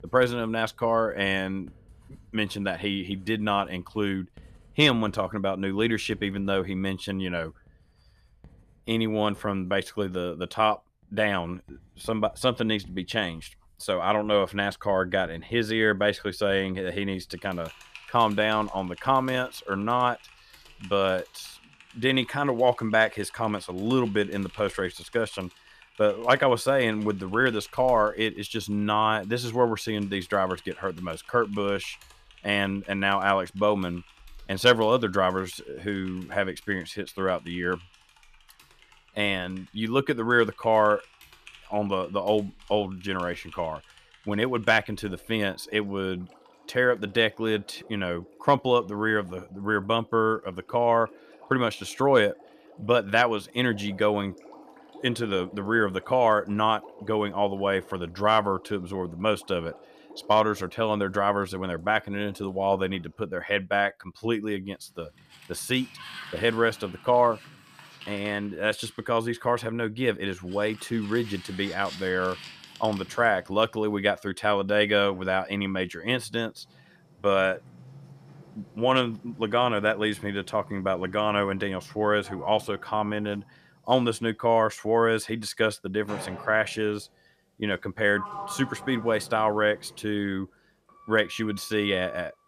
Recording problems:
household noises; faint; throughout; 25 dB below the speech

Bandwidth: 14.5 kHz